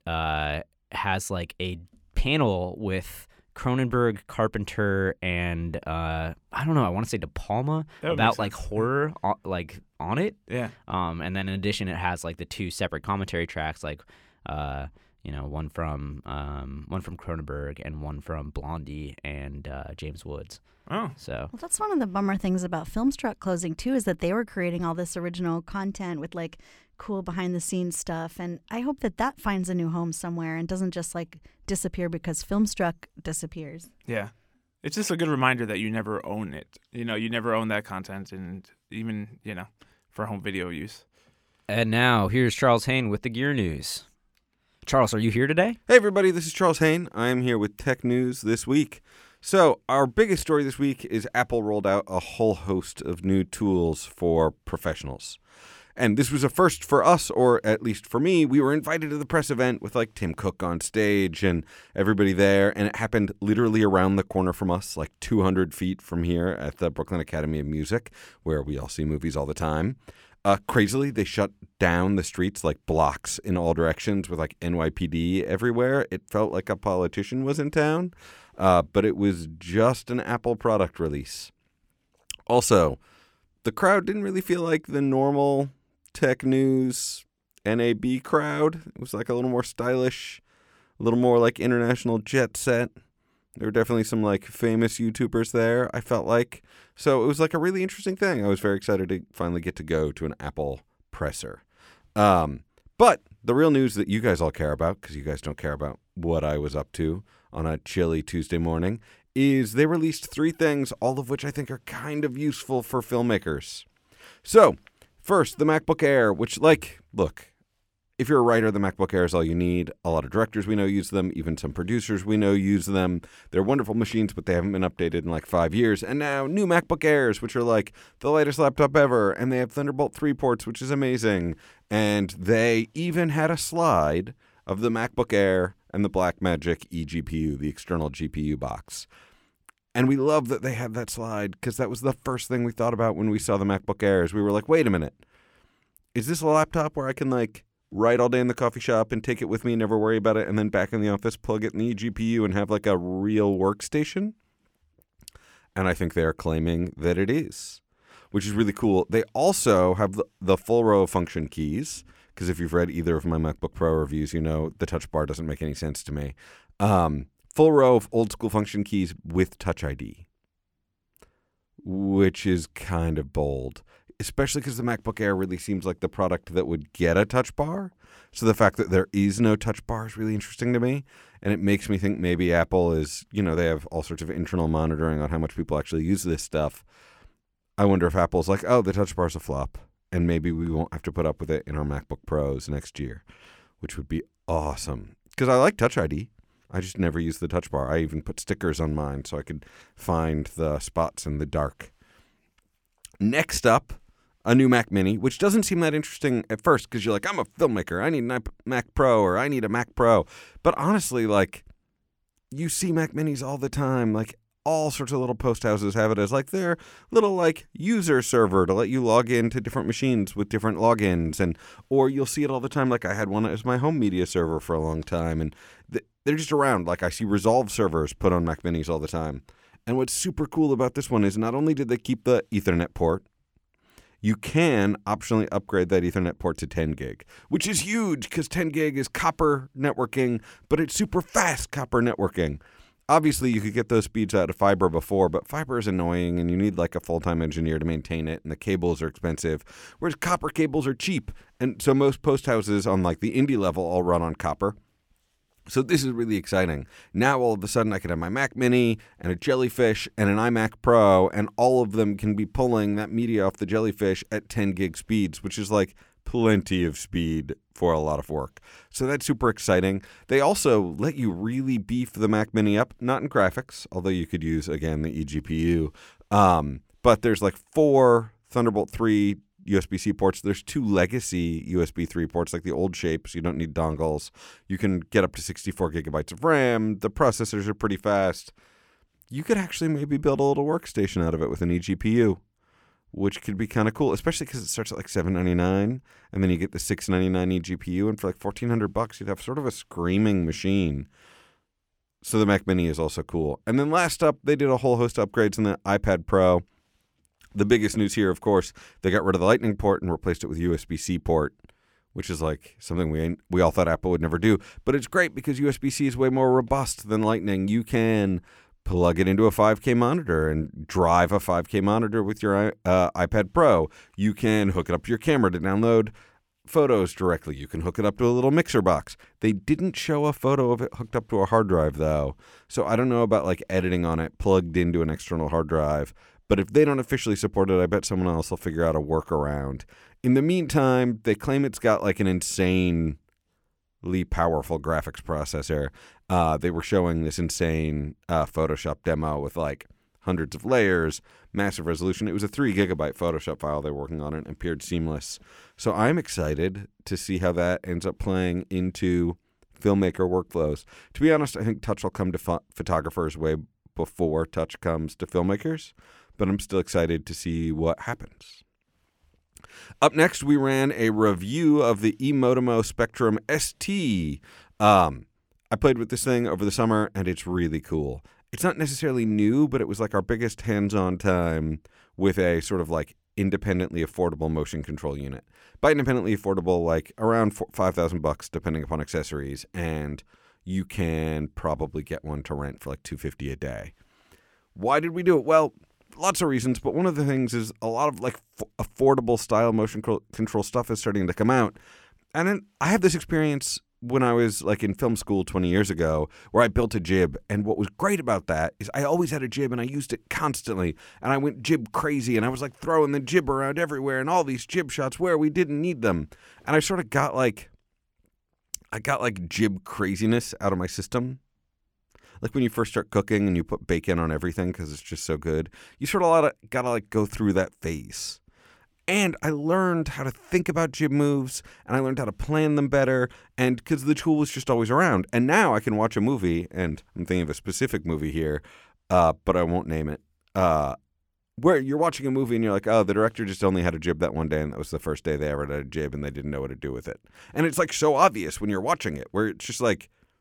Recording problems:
none

